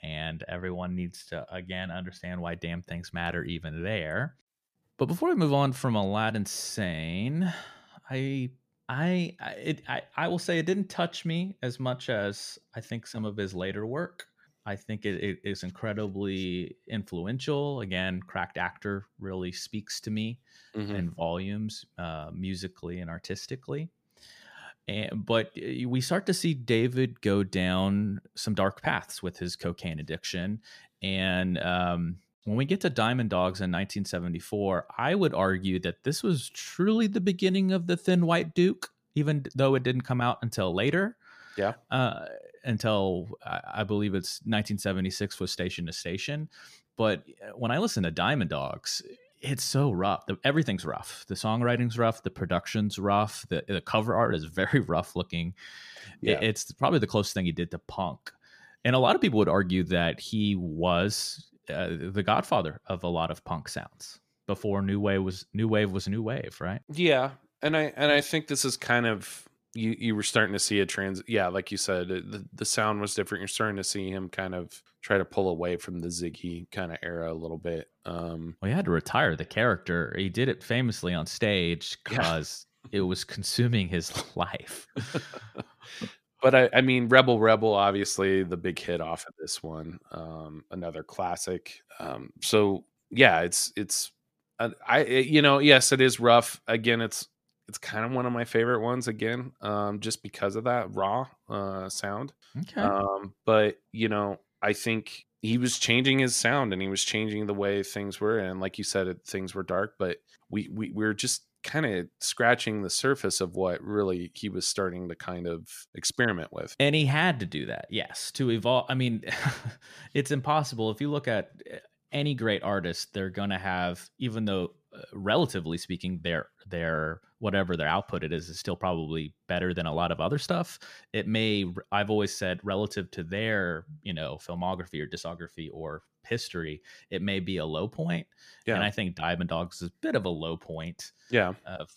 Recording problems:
none

